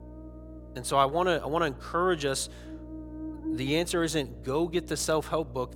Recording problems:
electrical hum; noticeable; throughout; 60 Hz, 20 dB below the speech

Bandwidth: 17 kHz